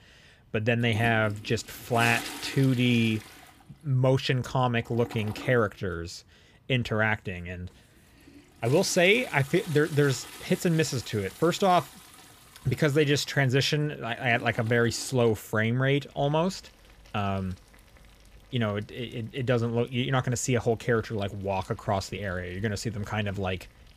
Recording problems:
household noises; noticeable; throughout; 15 dB below the speech

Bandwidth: 15 kHz